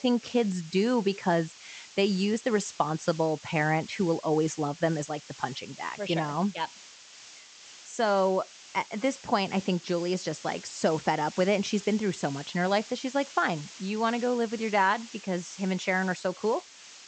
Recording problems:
high frequencies cut off; noticeable; nothing above 8 kHz
hiss; noticeable; throughout; 15 dB below the speech

